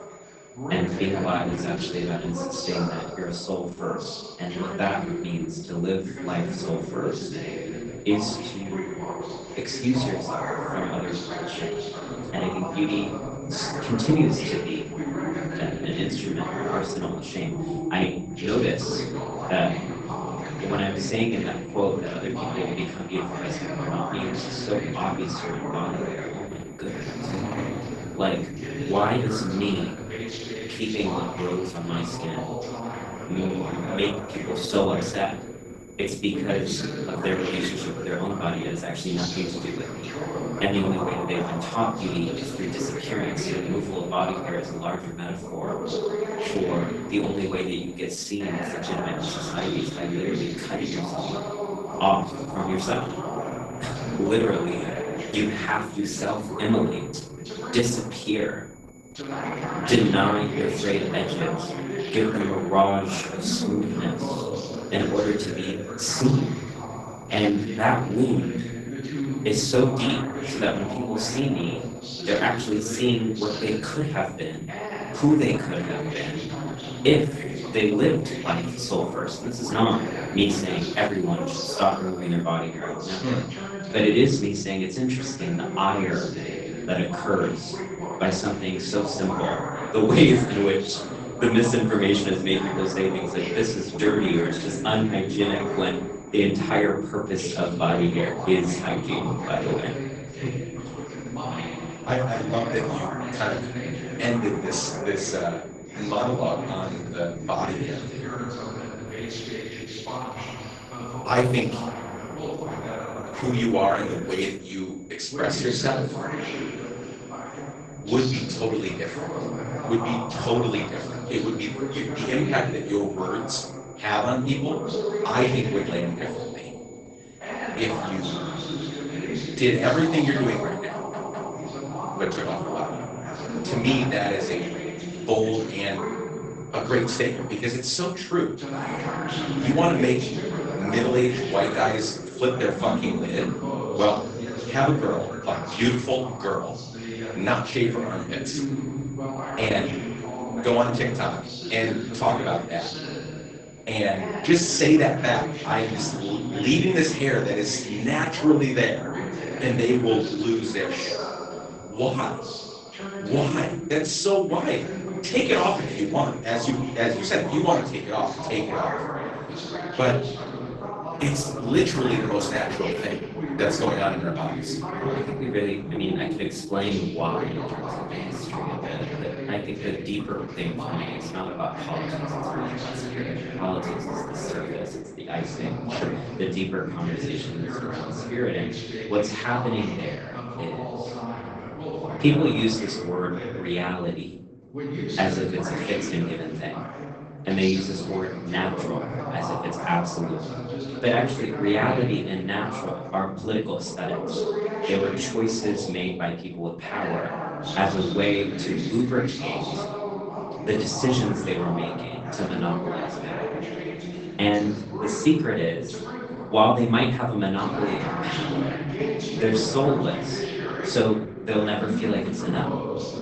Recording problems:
off-mic speech; far
garbled, watery; badly; nothing above 8 kHz
room echo; slight; dies away in 0.4 s
voice in the background; loud; throughout; 6 dB below the speech
high-pitched whine; faint; until 2:48; 7 kHz, 25 dB below the speech
audio stuttering; at 2:11

